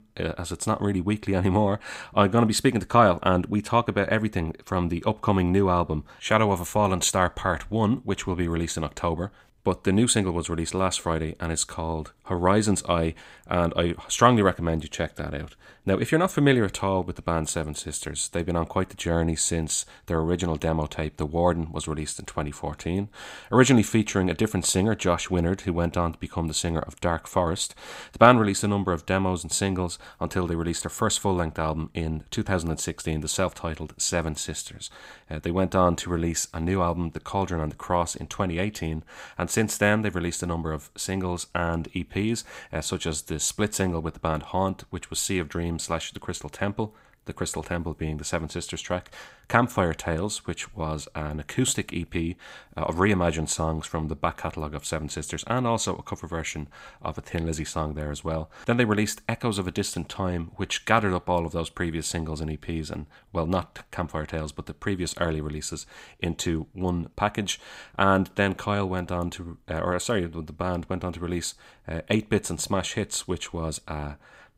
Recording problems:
none

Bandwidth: 15.5 kHz